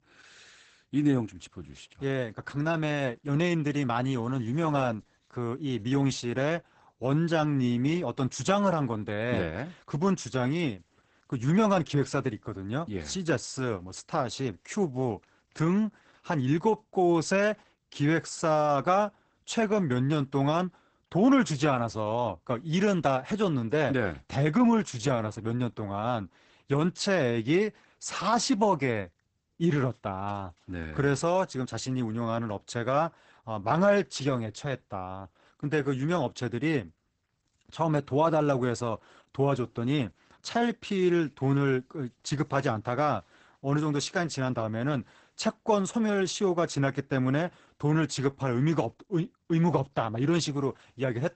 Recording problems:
garbled, watery; badly; nothing above 8 kHz

